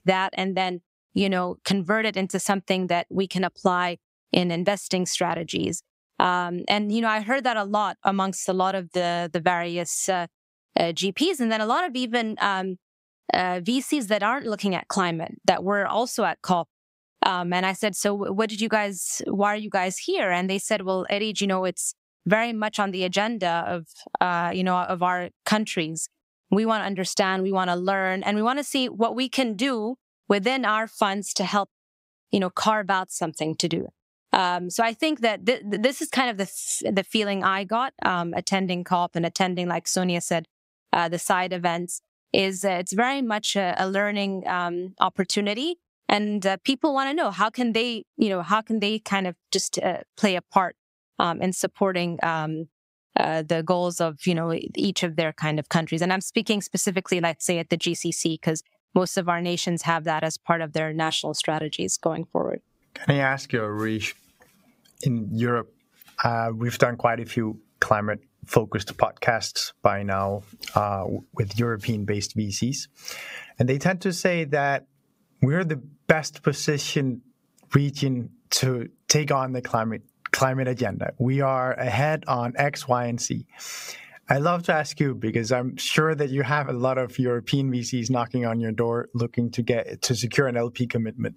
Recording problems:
squashed, flat; somewhat

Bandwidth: 15.5 kHz